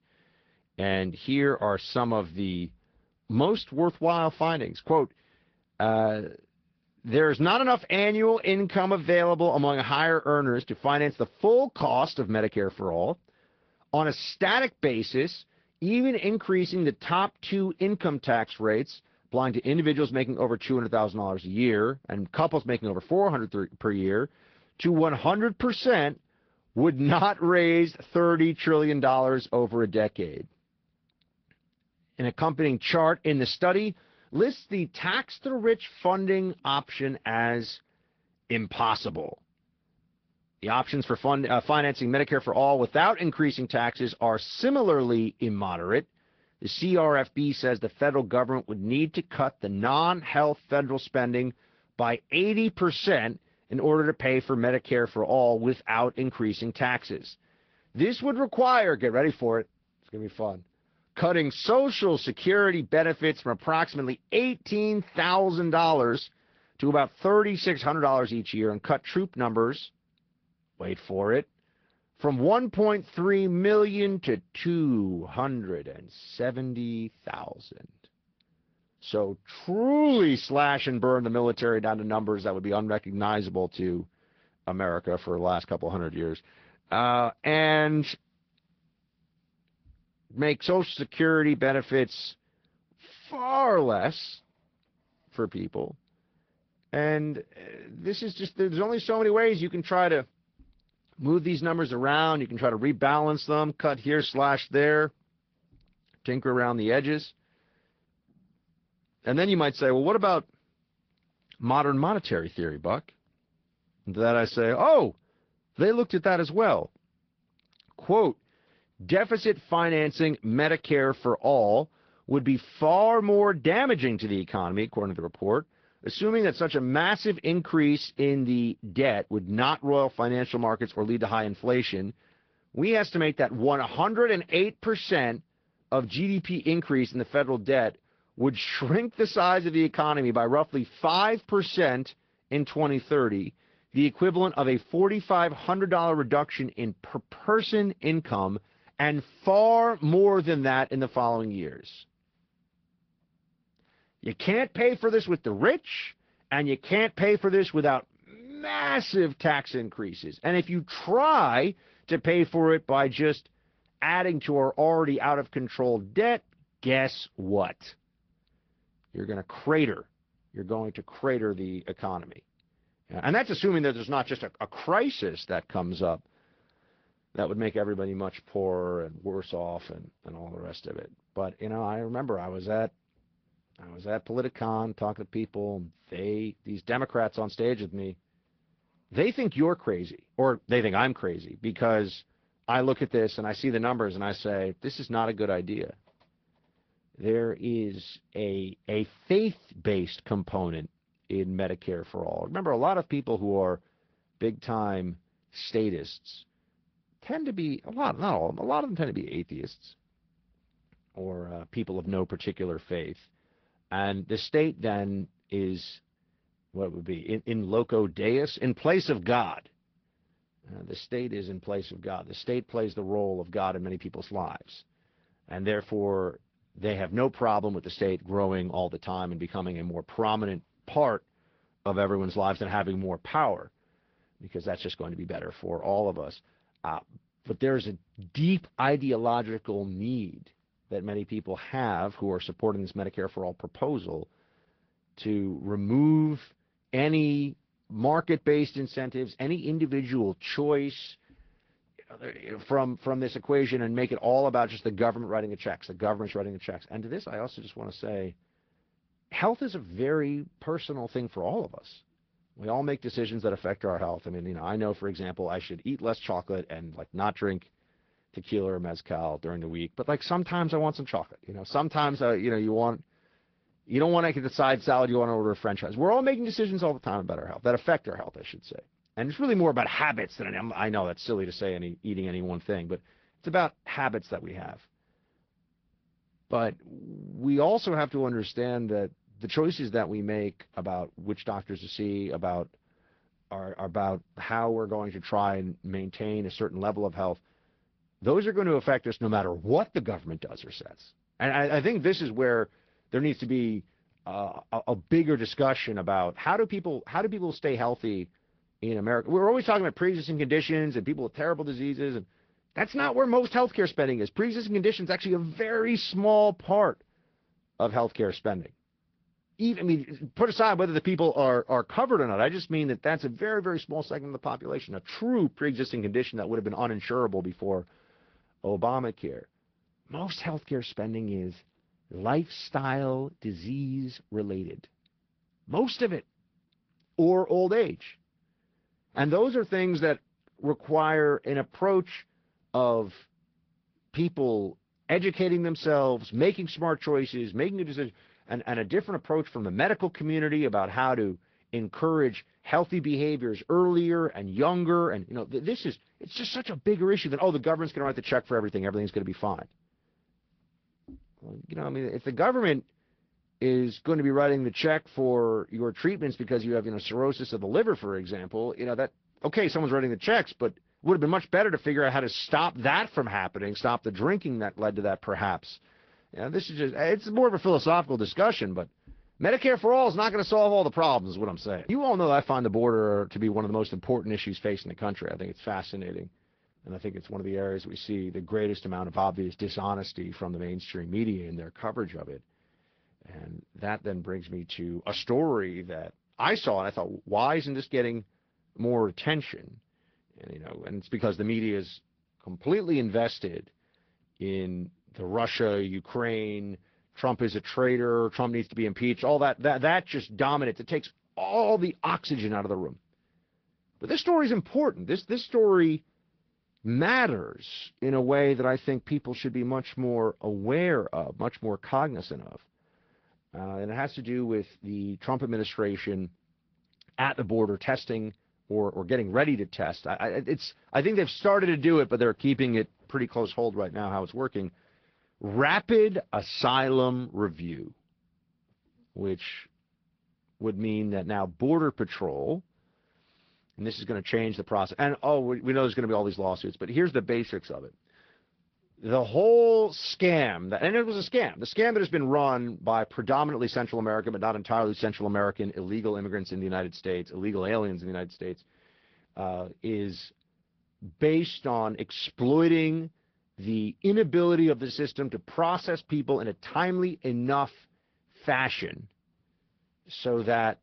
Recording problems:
high frequencies cut off; noticeable; nothing above 5.5 kHz
garbled, watery; slightly

